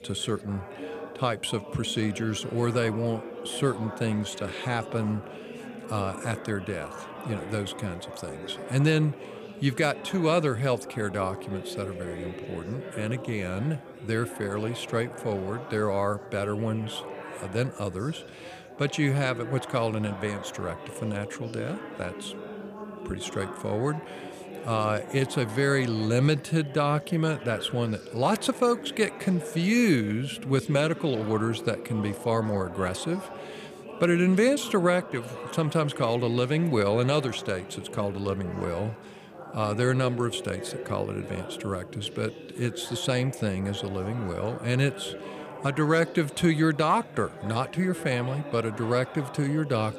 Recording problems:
chatter from many people; noticeable; throughout; 10 dB below the speech

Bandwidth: 15 kHz